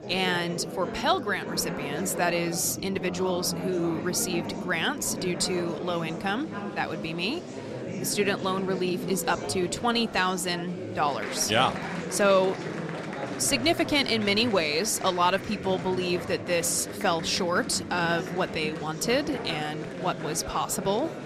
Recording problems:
chatter from many people; loud; throughout; 8 dB below the speech

